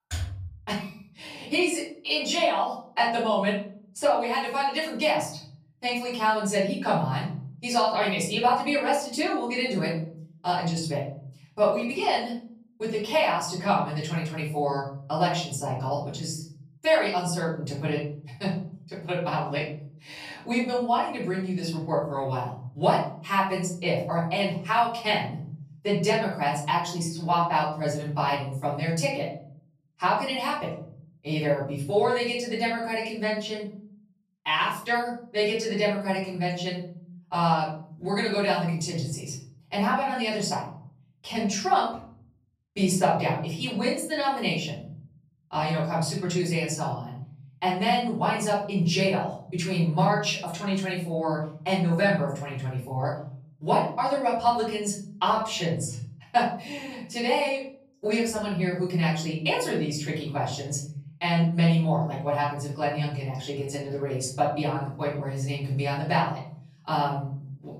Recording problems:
off-mic speech; far
room echo; noticeable; dies away in 0.8 s

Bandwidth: 14.5 kHz